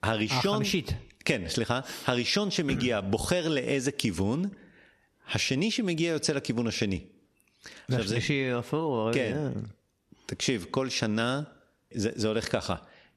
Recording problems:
squashed, flat; somewhat

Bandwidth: 13.5 kHz